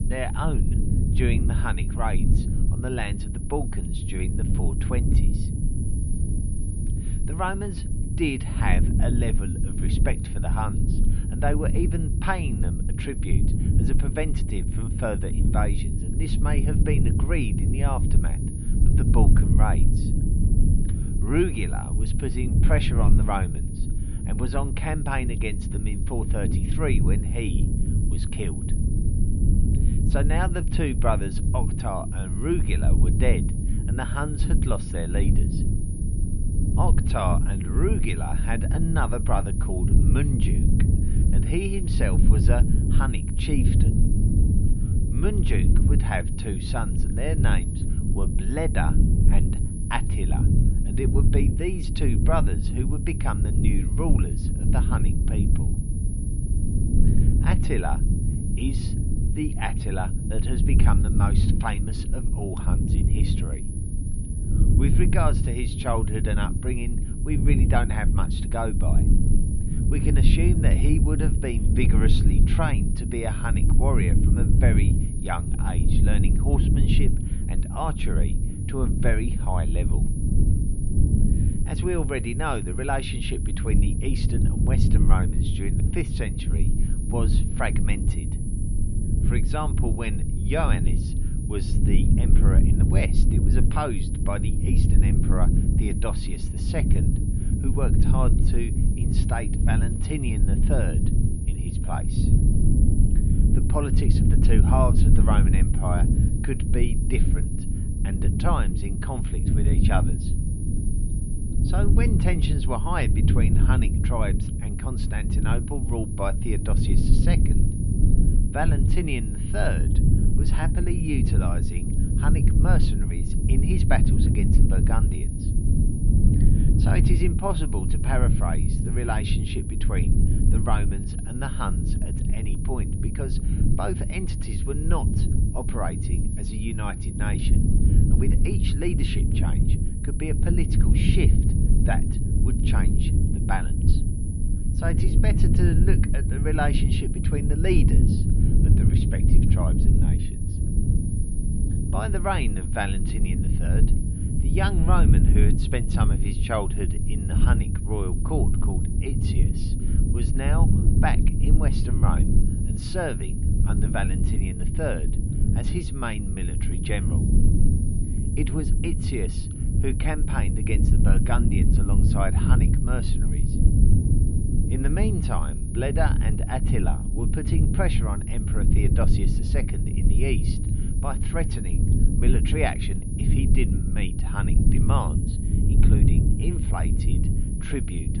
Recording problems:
muffled; slightly; fading above 4 kHz
high-pitched whine; loud; throughout; 10.5 kHz, 10 dB below the speech
low rumble; loud; throughout; 4 dB below the speech

